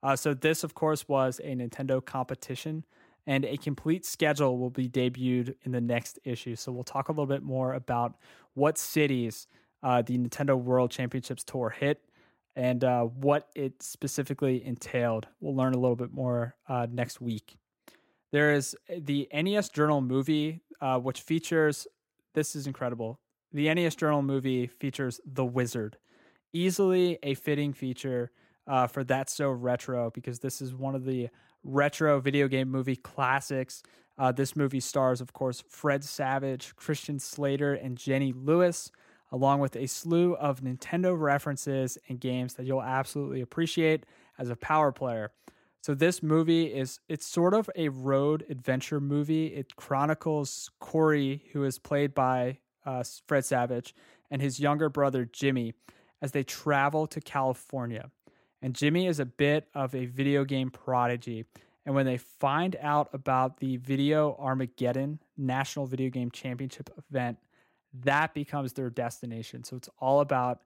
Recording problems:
none

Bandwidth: 16 kHz